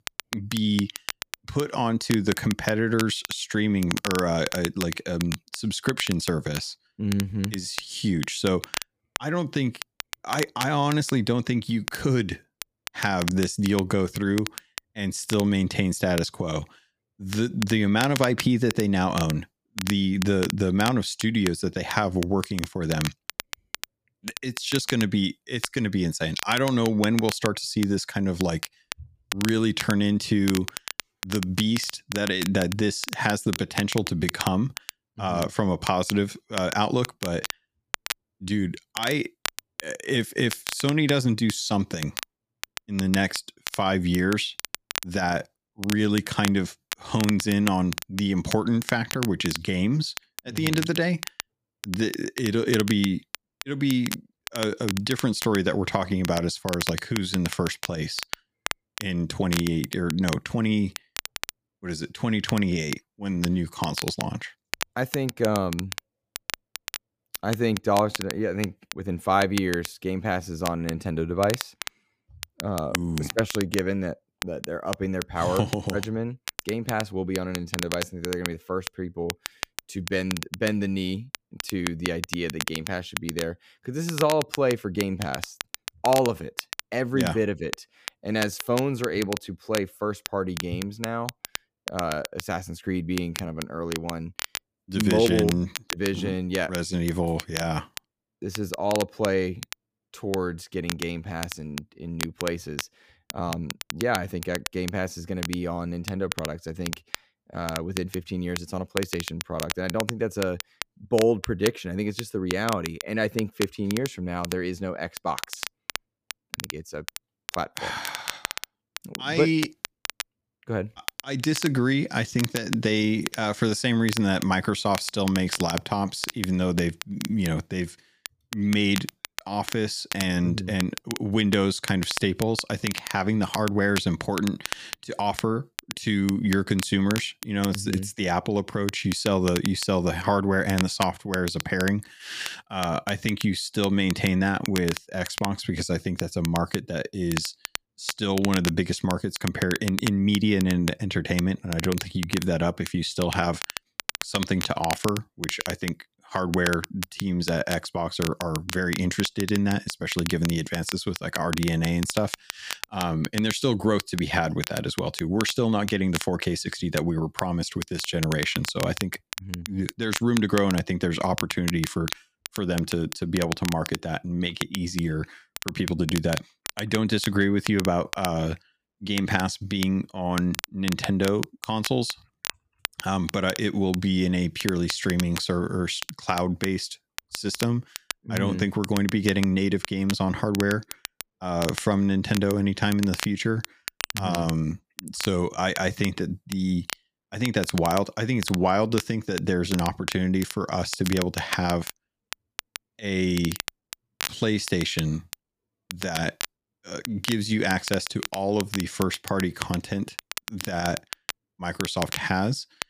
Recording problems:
crackle, like an old record; loud; 9 dB below the speech

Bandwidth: 15 kHz